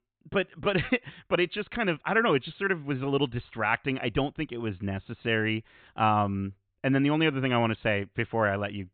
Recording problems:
high frequencies cut off; severe; nothing above 4 kHz

